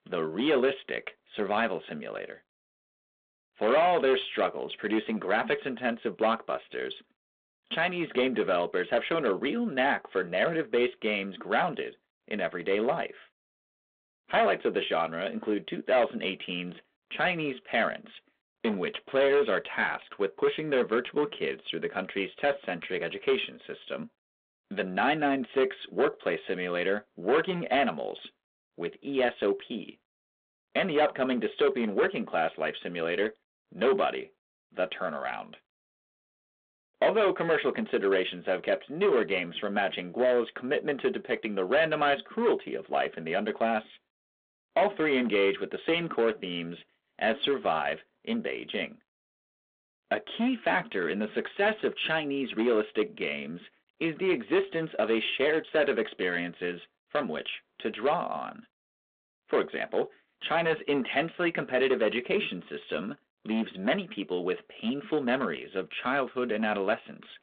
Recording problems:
phone-call audio
distortion; slight; 5% of the sound clipped

